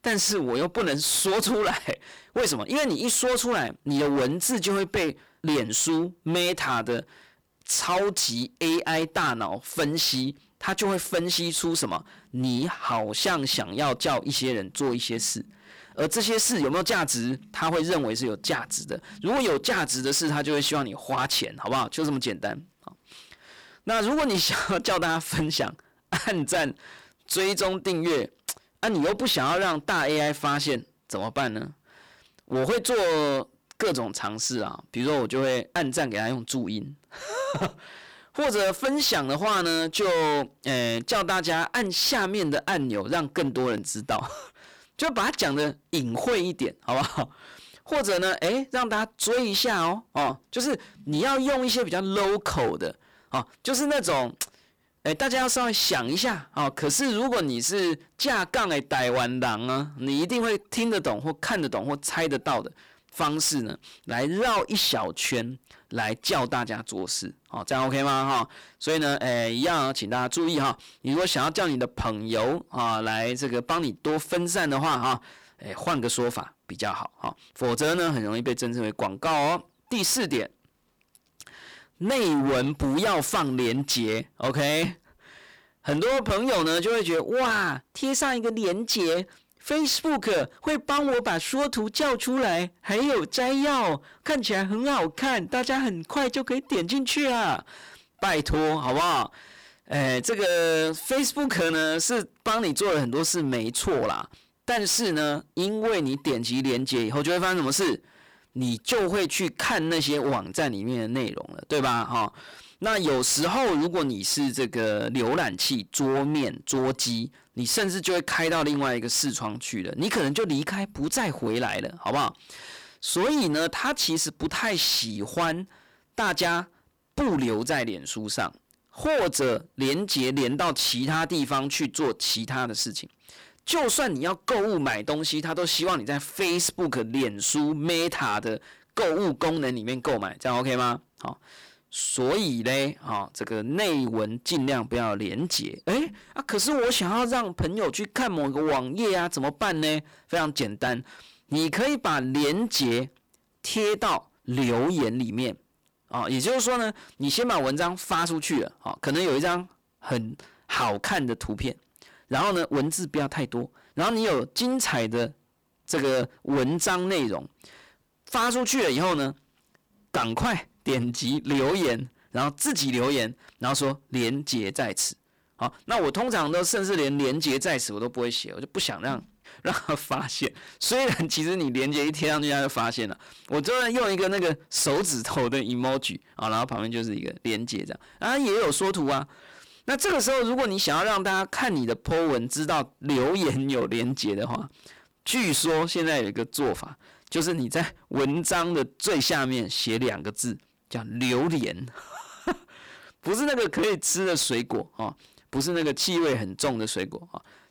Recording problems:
distortion; heavy; 18% of the sound clipped

